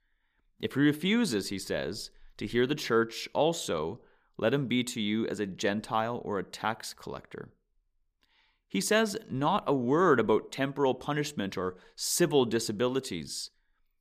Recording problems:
none

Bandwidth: 15 kHz